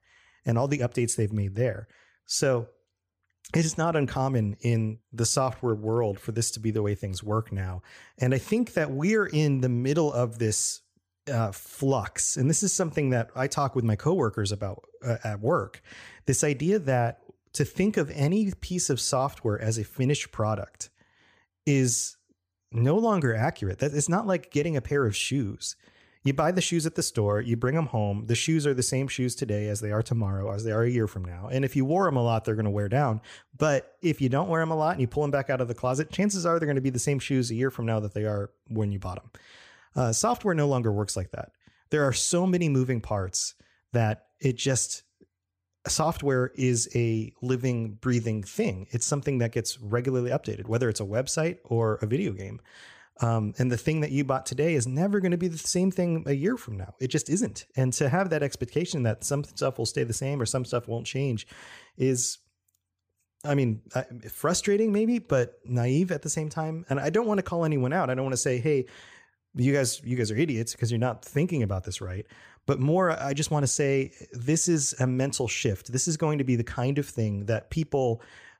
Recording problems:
none

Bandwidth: 15 kHz